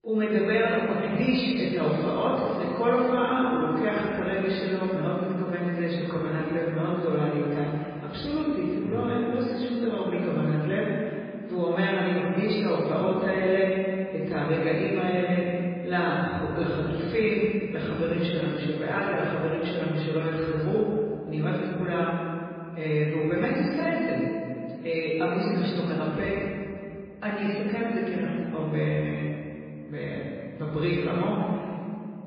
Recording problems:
off-mic speech; far
garbled, watery; badly; nothing above 4.5 kHz
room echo; noticeable; dies away in 2.3 s

